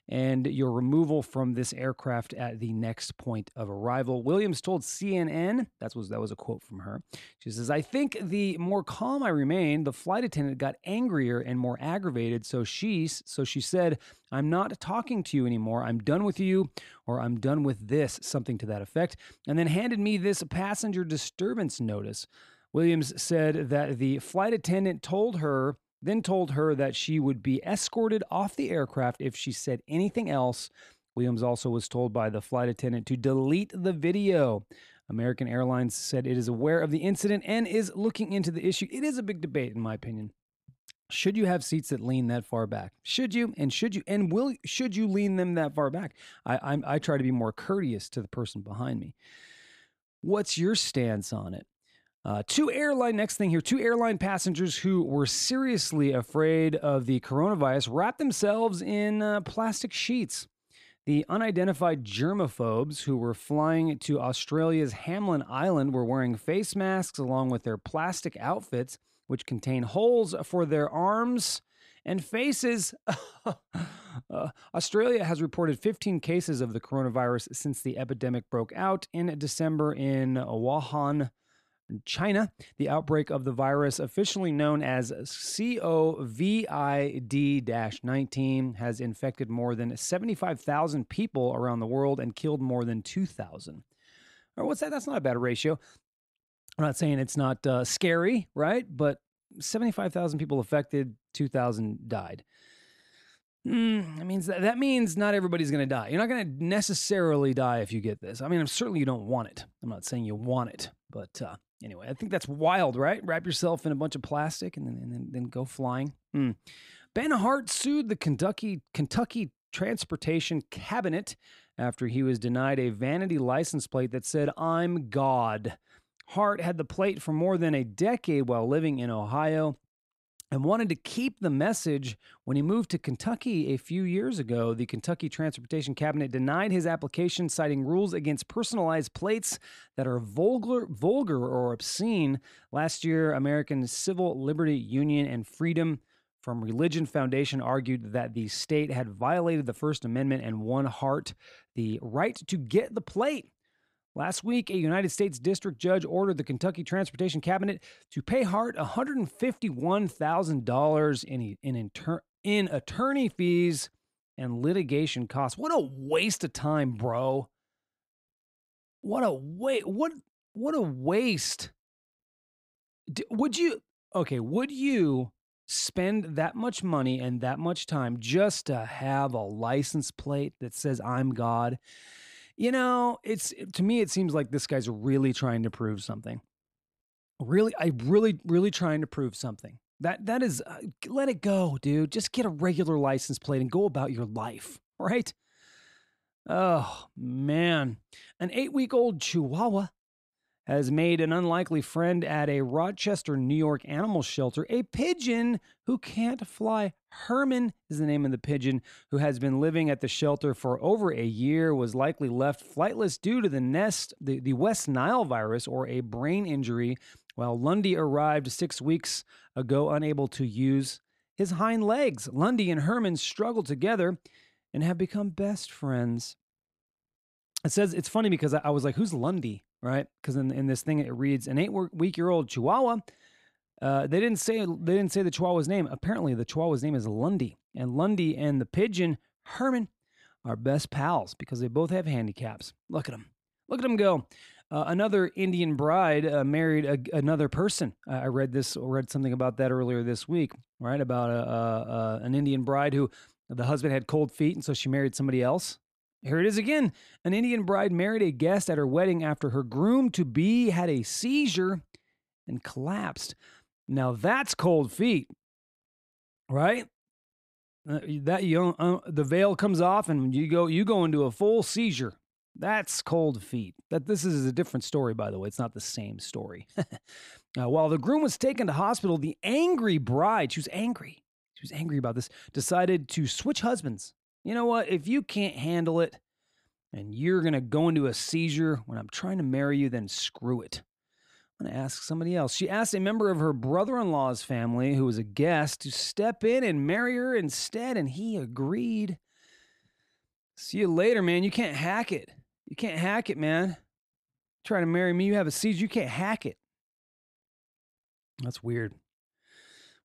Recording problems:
none

